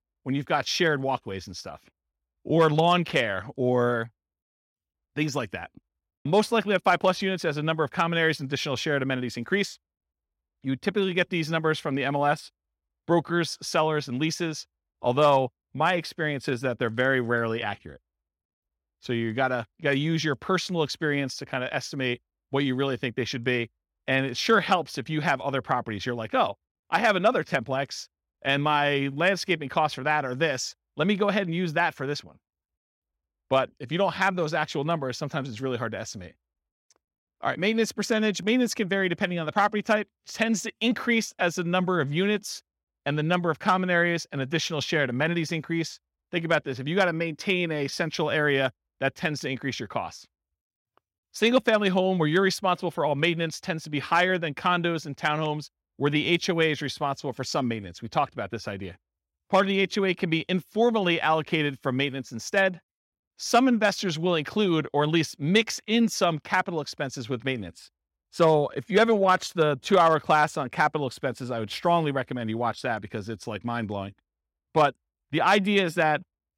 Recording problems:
none

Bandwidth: 16 kHz